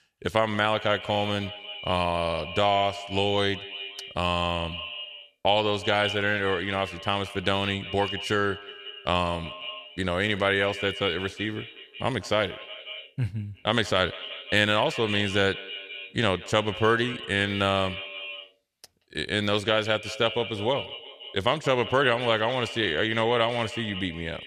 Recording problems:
echo of what is said; strong; throughout; 180 ms later, 10 dB below the speech

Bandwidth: 14 kHz